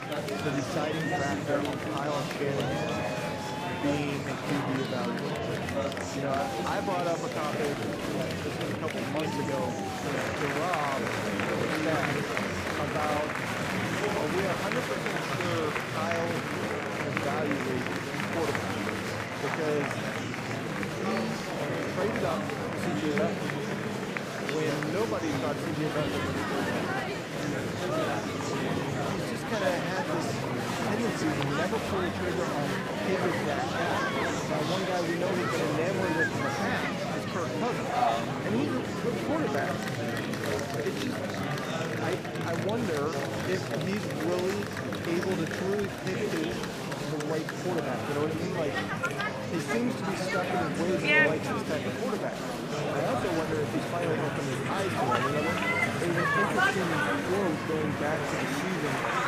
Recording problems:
murmuring crowd; very loud; throughout; 3 dB above the speech

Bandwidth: 15 kHz